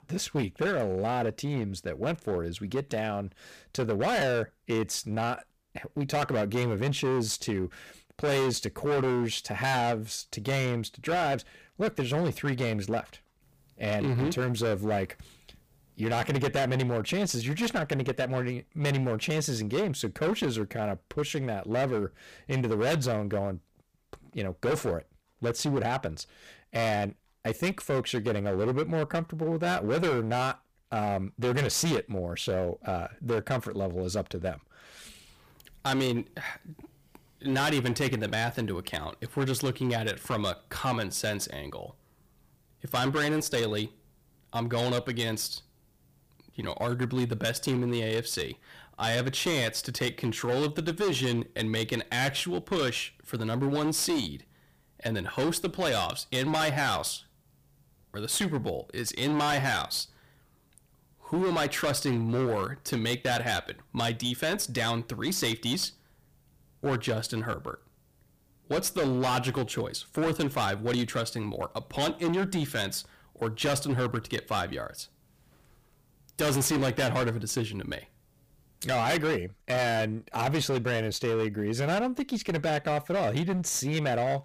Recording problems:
distortion; heavy; 15% of the sound clipped

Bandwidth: 15 kHz